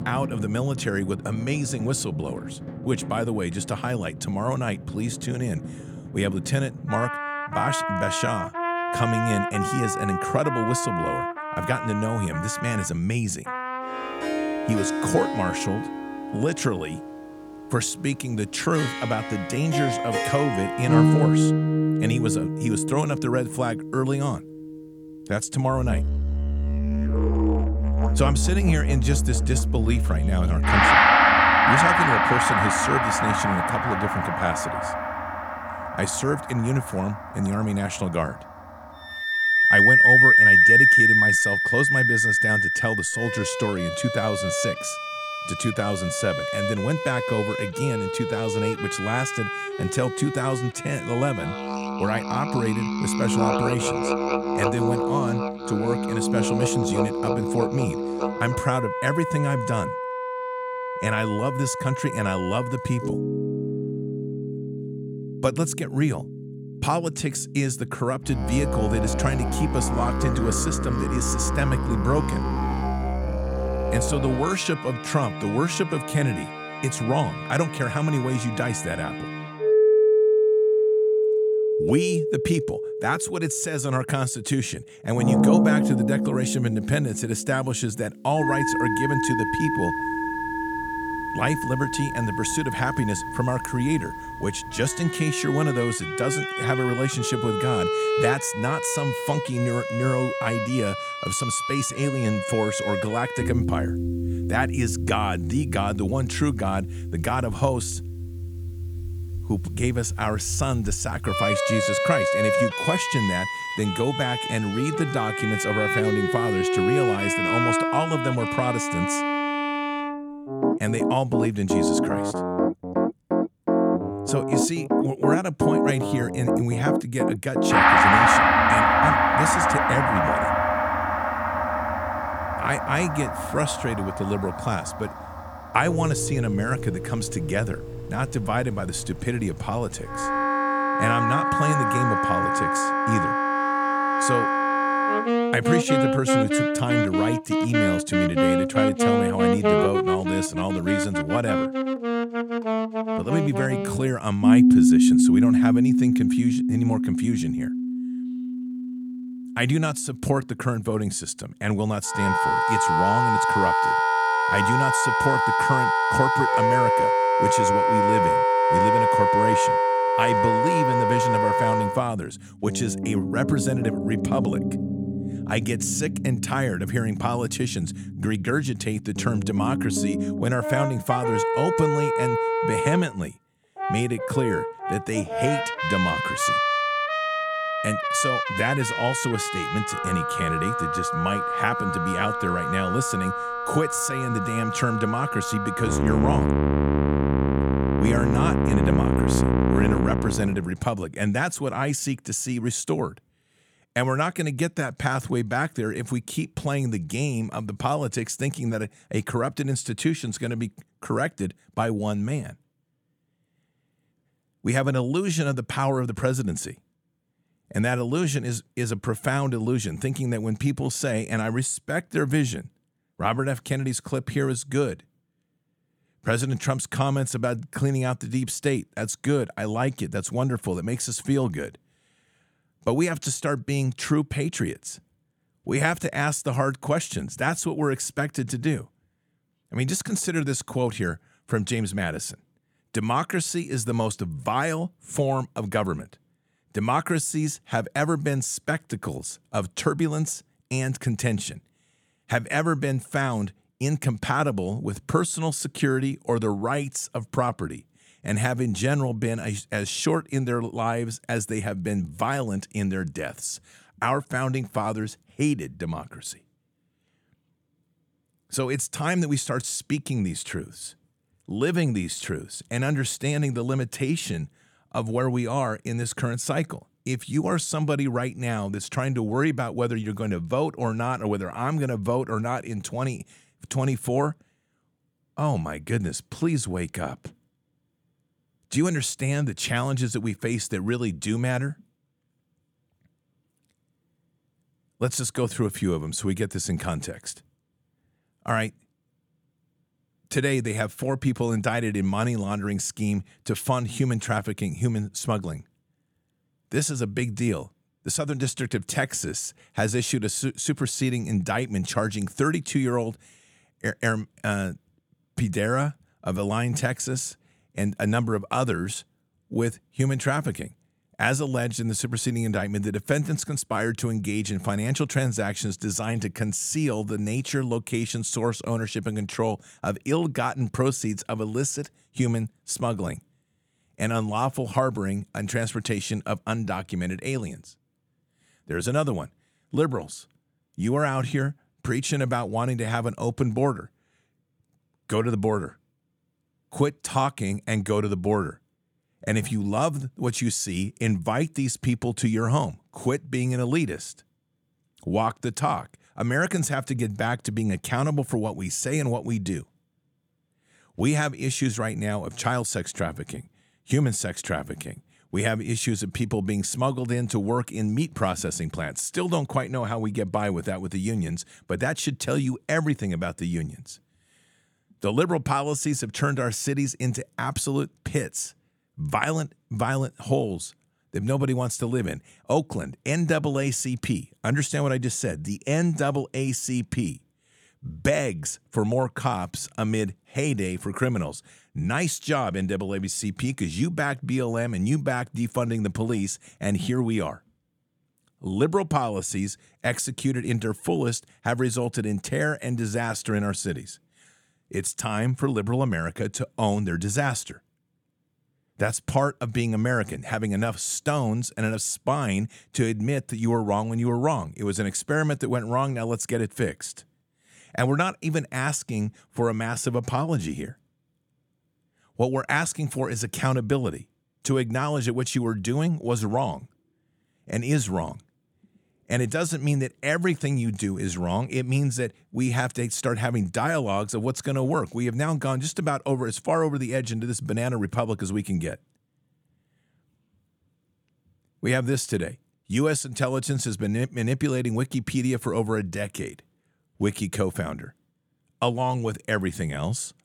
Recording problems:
background music; very loud; until 3:20; 3 dB above the speech

